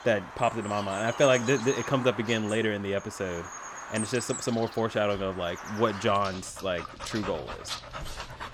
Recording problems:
animal sounds; noticeable; throughout; 10 dB below the speech

